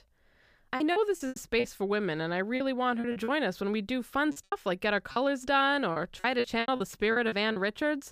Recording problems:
choppy; very; 13% of the speech affected

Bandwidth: 15 kHz